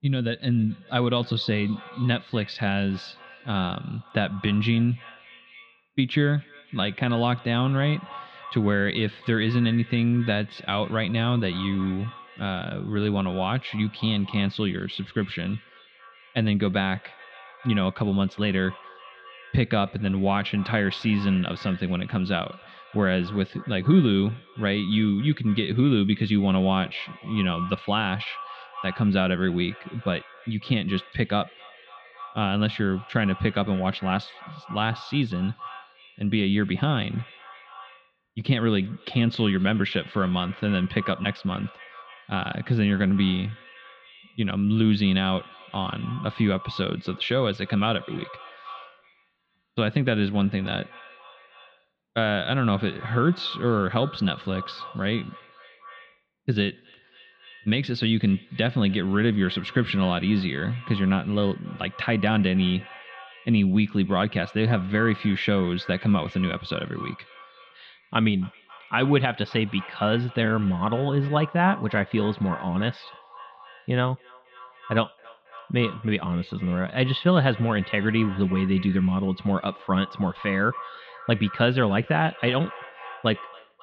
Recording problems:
muffled; slightly; fading above 3.5 kHz
echo of what is said; faint; throughout; 270 ms later, 20 dB below the speech

